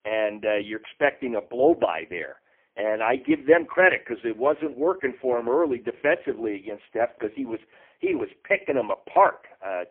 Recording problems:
phone-call audio; poor line

